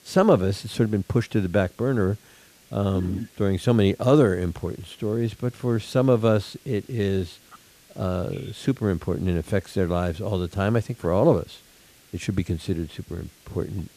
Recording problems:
hiss; faint; throughout; 30 dB below the speech

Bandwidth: 14.5 kHz